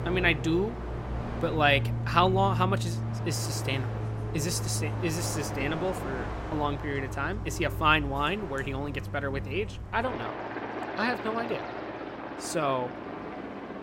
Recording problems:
train or aircraft noise; loud; throughout; 5 dB below the speech

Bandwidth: 16 kHz